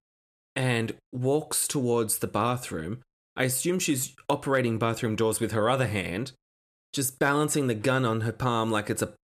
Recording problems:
none

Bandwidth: 14 kHz